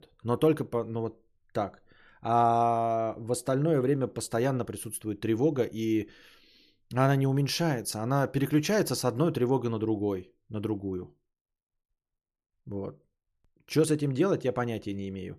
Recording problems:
none

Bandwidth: 13.5 kHz